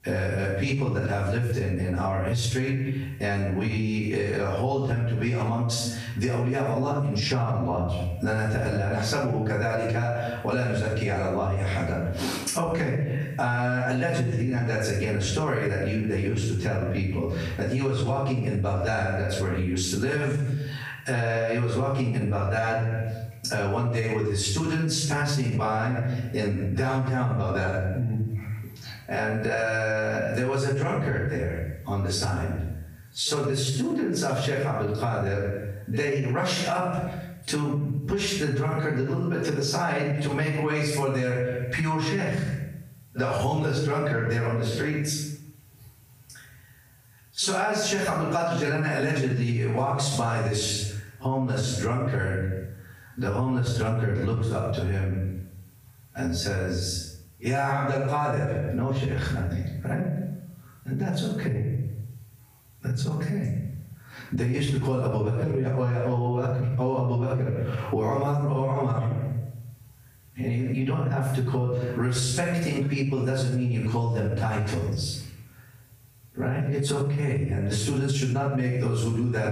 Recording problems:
off-mic speech; far
squashed, flat; heavily
room echo; noticeable; dies away in 0.6 s

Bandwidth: 15 kHz